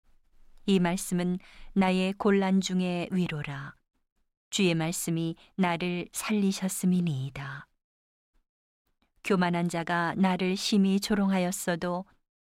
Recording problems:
none

